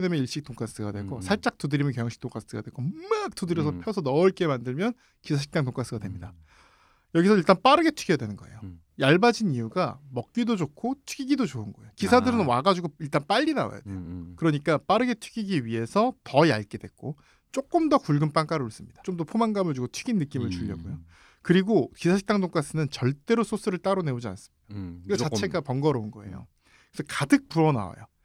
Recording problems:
abrupt cut into speech; at the start

